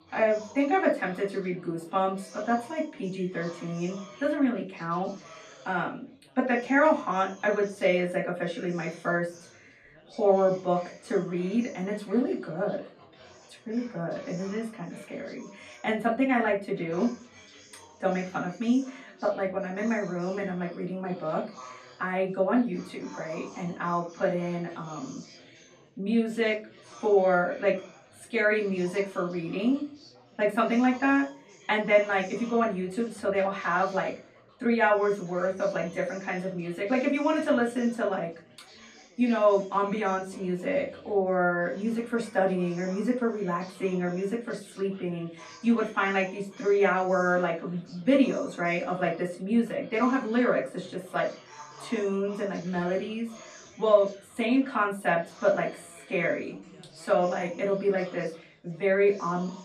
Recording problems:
off-mic speech; far
room echo; slight; dies away in 0.3 s
chatter from many people; faint; throughout; 20 dB below the speech

